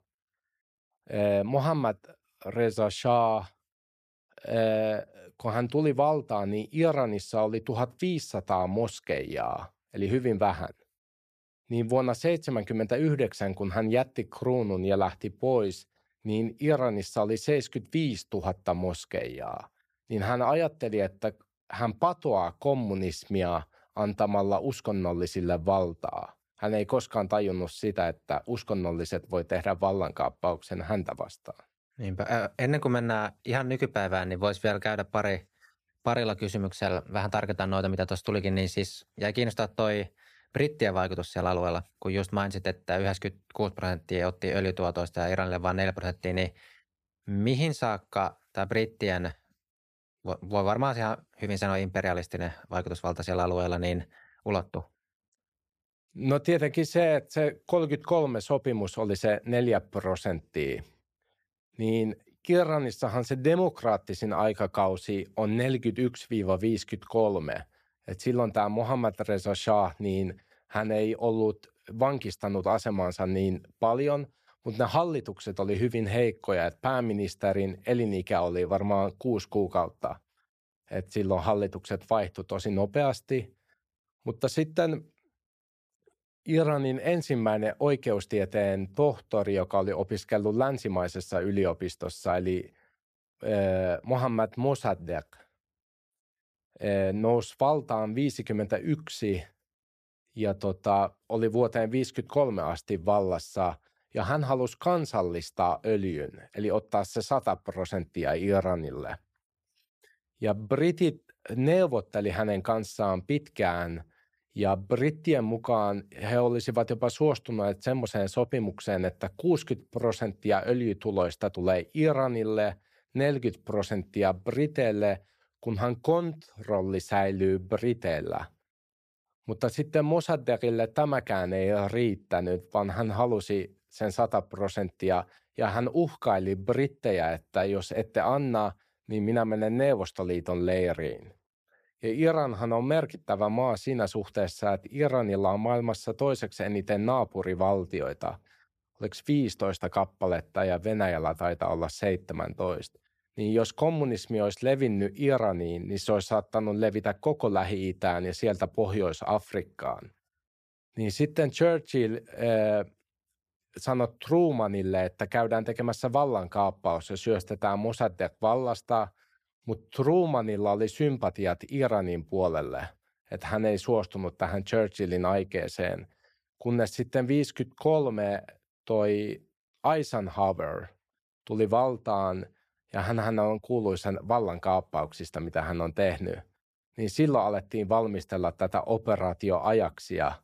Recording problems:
none

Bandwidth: 14.5 kHz